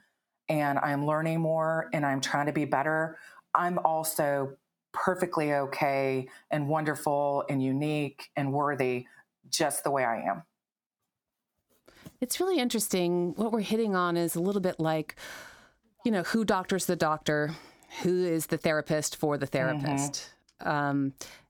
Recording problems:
squashed, flat; somewhat

